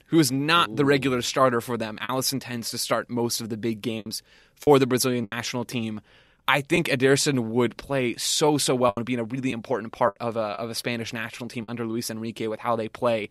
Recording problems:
choppy; occasionally; 4% of the speech affected

